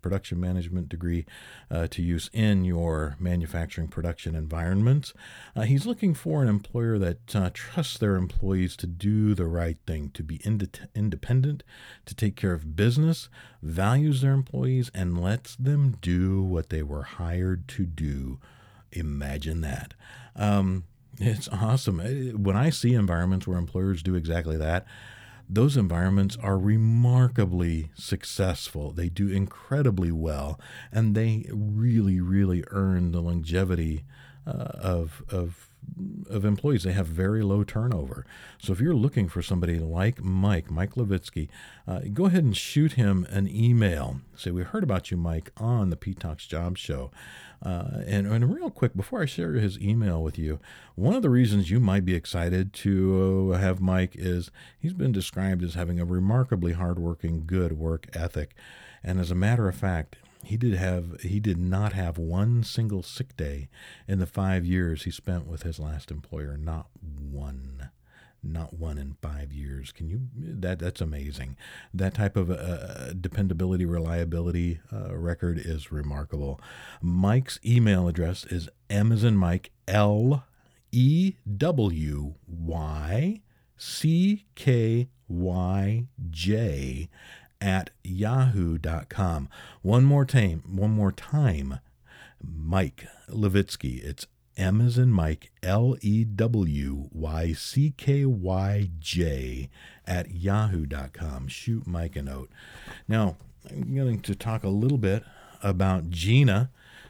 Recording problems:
none

